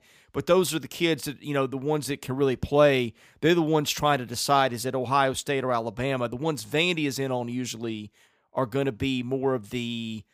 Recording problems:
none

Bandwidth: 15 kHz